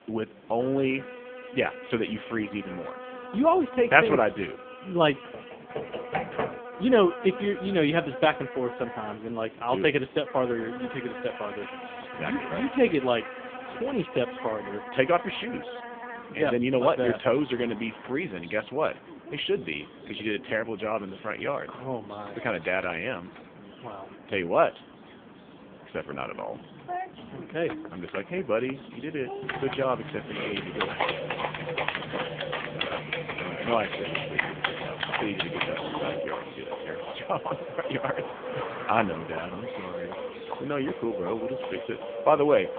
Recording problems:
phone-call audio; poor line; nothing above 3.5 kHz
animal sounds; noticeable; throughout; 10 dB below the speech
traffic noise; noticeable; throughout; 20 dB below the speech
chatter from many people; faint; throughout; 25 dB below the speech
keyboard typing; noticeable; from 5.5 to 6.5 s and from 29 to 36 s; peak level with the speech

